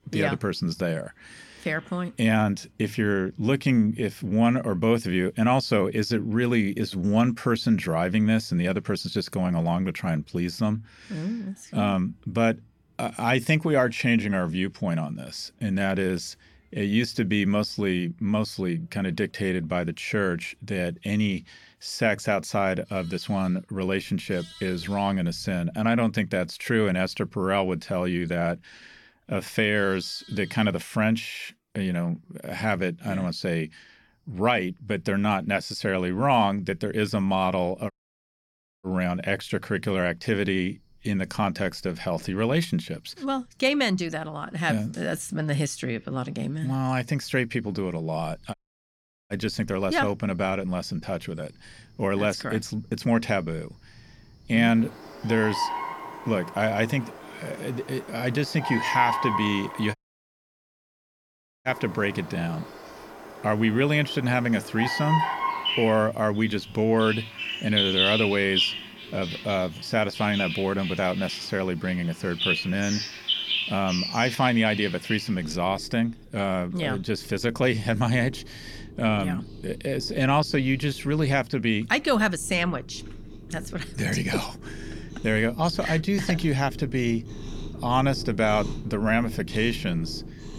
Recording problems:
animal sounds; loud; throughout; 6 dB below the speech
audio cutting out; at 38 s for 1 s, at 49 s for 1 s and at 1:00 for 1.5 s

